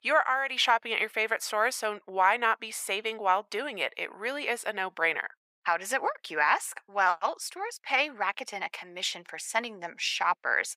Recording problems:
thin; very; fading below 750 Hz

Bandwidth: 15.5 kHz